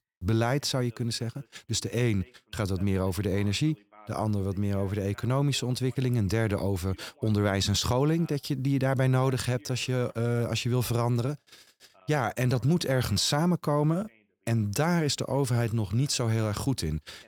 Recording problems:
voice in the background; faint; throughout; 30 dB below the speech

